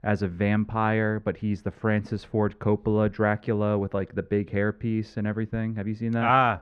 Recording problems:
muffled; very; fading above 3.5 kHz

